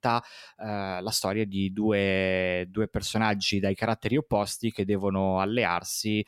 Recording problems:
none

